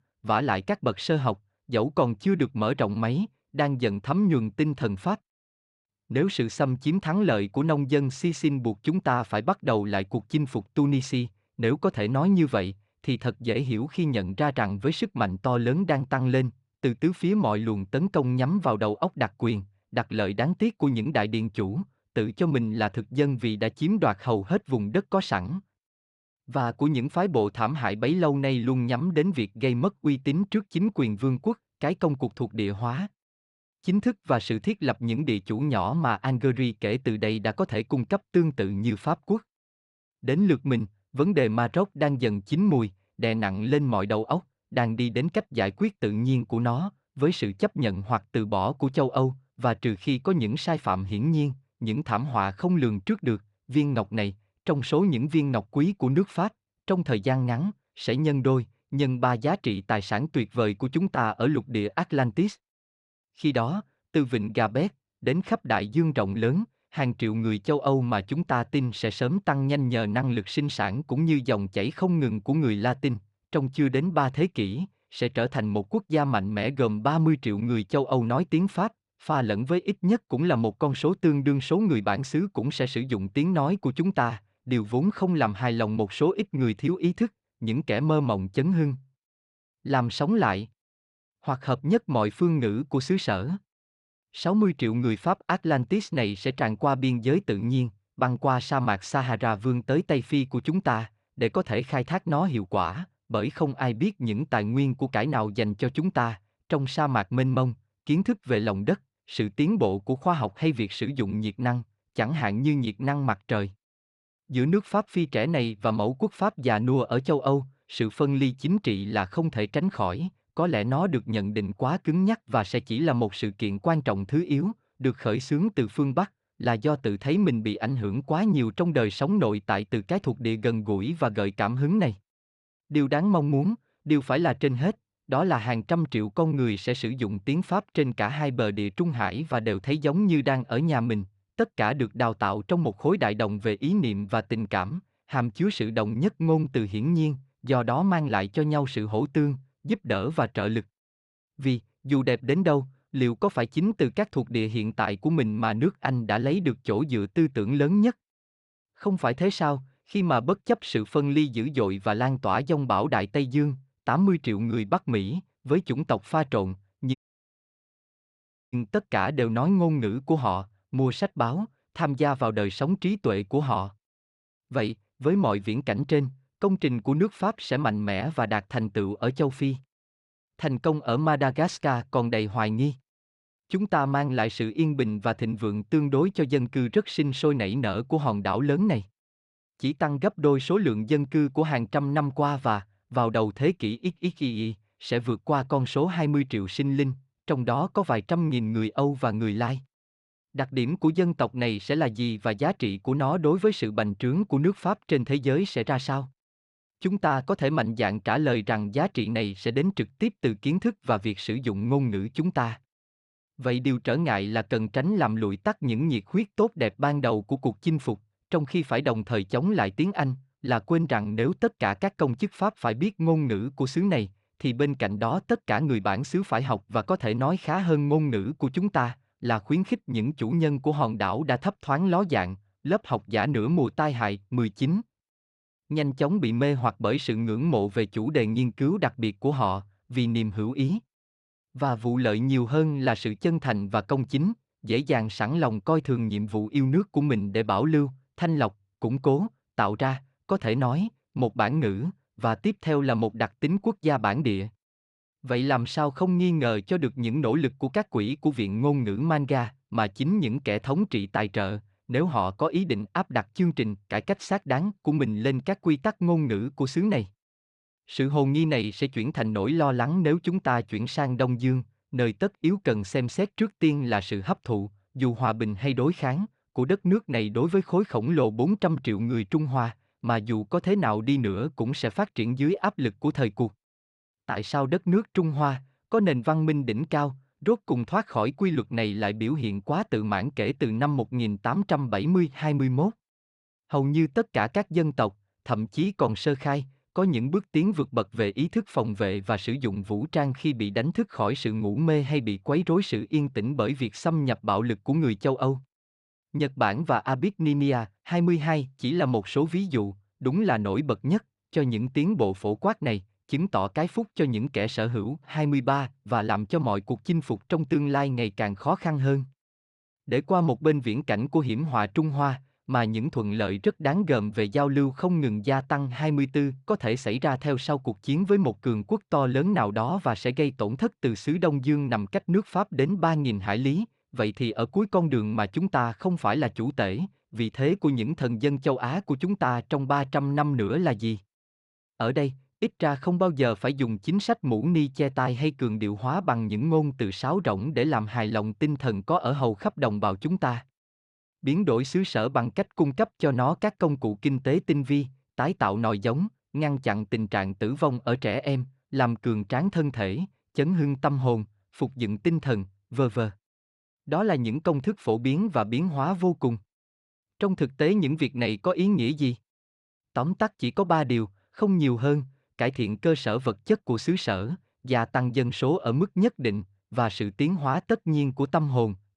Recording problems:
audio cutting out; at 2:47 for 1.5 s

